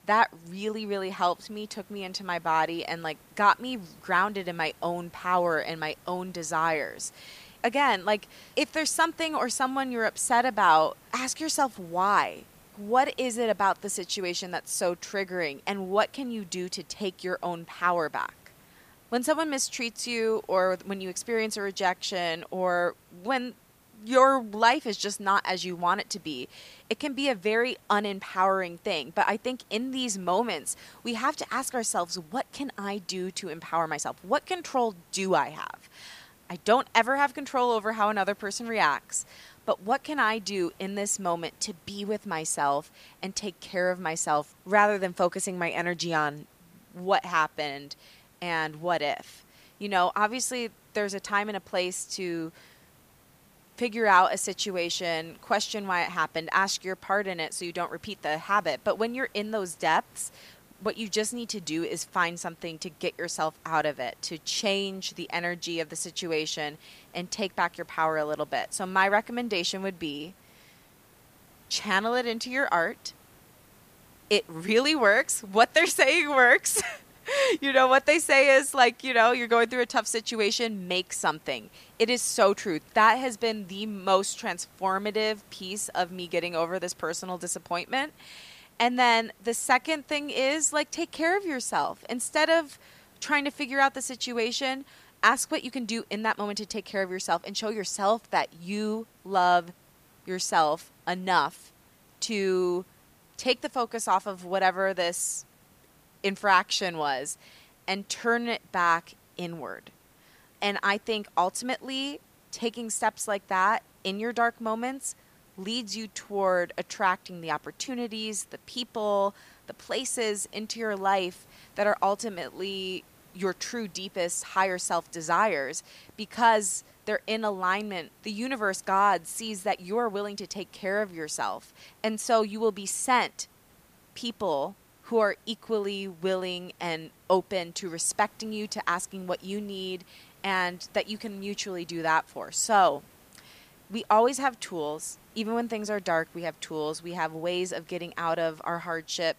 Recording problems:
hiss; faint; throughout; 30 dB below the speech

